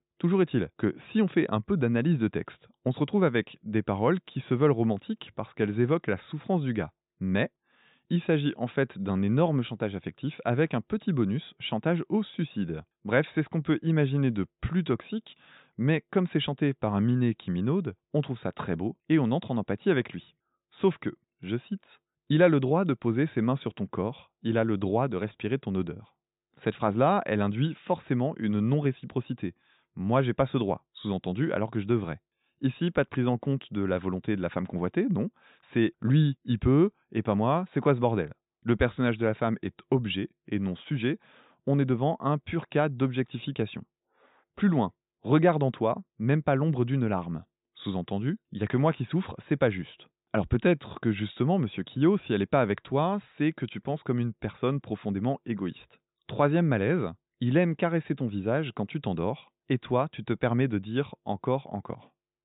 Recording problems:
high frequencies cut off; severe; nothing above 4 kHz

